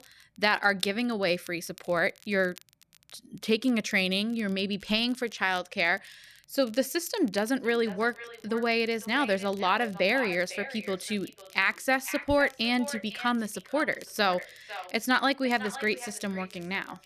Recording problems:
echo of what is said; noticeable; from 7.5 s on; 500 ms later, 15 dB below the speech
crackle, like an old record; faint; 25 dB below the speech

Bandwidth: 14.5 kHz